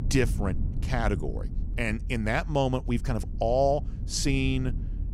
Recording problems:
low rumble; noticeable; throughout; 20 dB below the speech

